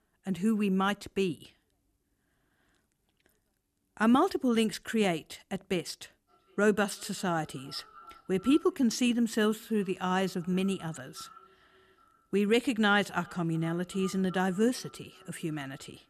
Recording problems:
echo of what is said; faint; from 6.5 s on; 380 ms later, 25 dB below the speech

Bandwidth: 14 kHz